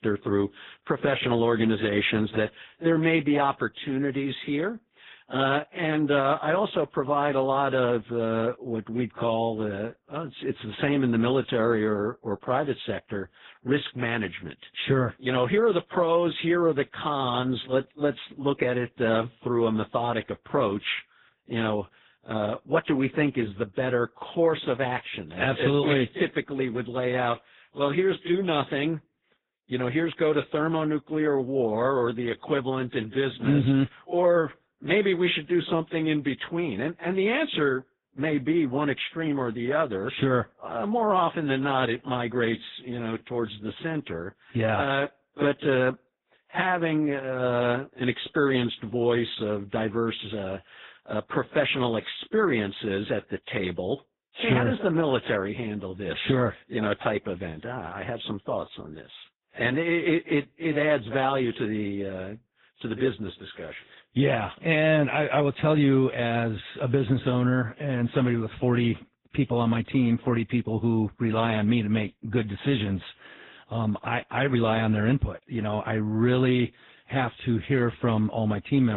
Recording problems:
garbled, watery; badly
high frequencies cut off; severe; nothing above 3.5 kHz
abrupt cut into speech; at the end

